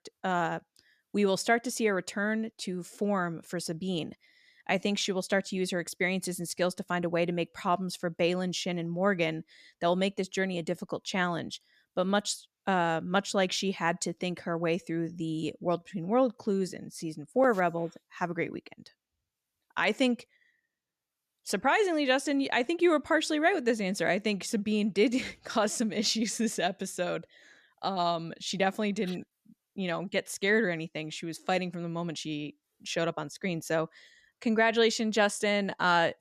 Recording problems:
none

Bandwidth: 14.5 kHz